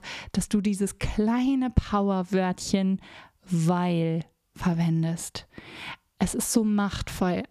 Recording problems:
squashed, flat; somewhat

